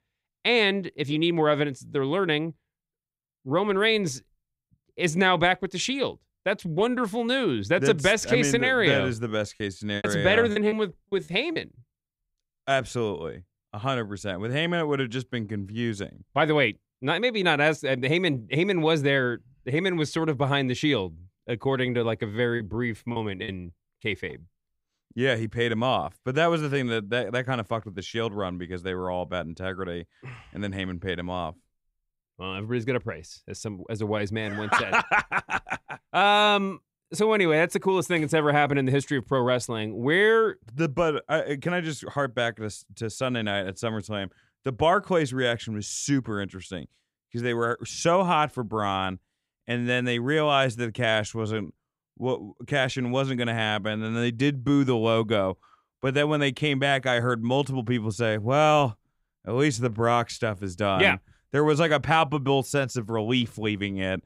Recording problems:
choppy; very; from 9.5 to 12 s and at 23 s; 12% of the speech affected

